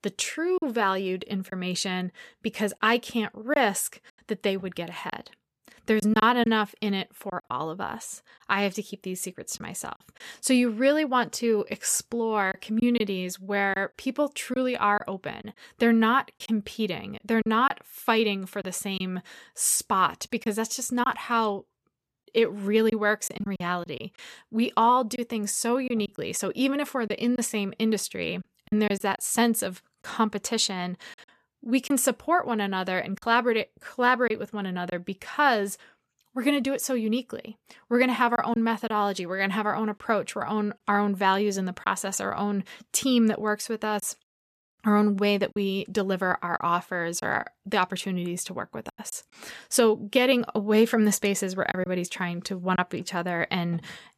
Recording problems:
choppy; occasionally; 4% of the speech affected

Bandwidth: 14 kHz